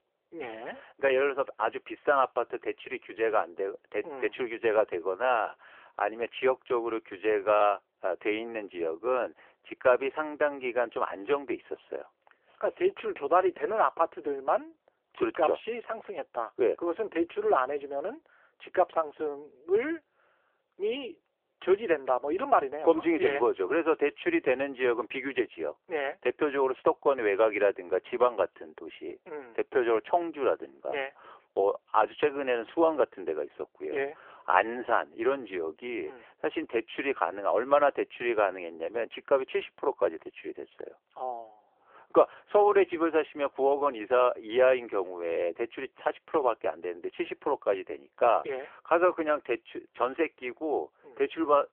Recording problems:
phone-call audio

